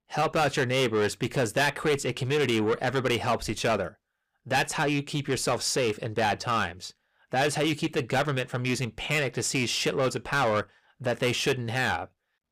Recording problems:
distortion; heavy; 7 dB below the speech

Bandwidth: 15 kHz